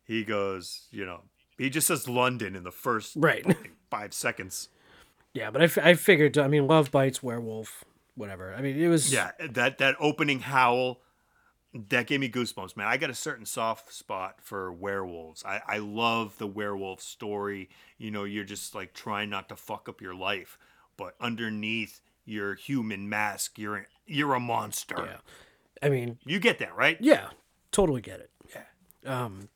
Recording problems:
none

